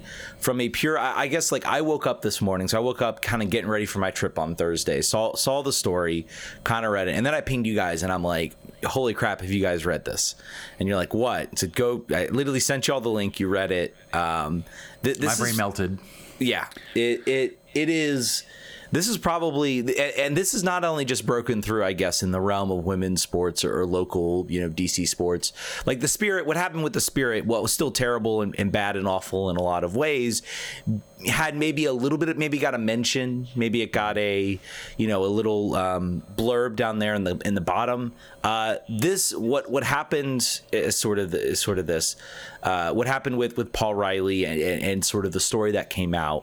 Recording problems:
squashed, flat; heavily

